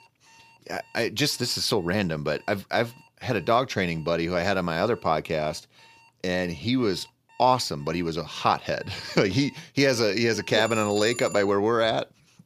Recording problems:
alarms or sirens; faint; throughout; 25 dB below the speech

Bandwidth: 15 kHz